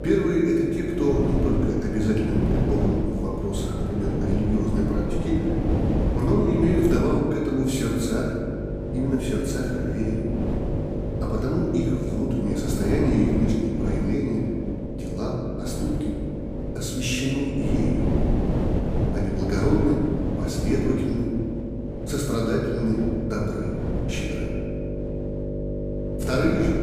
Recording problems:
off-mic speech; far
room echo; noticeable; dies away in 1.8 s
wind noise on the microphone; heavy; 6 dB below the speech
electrical hum; loud; throughout; 50 Hz, 8 dB below the speech

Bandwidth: 15 kHz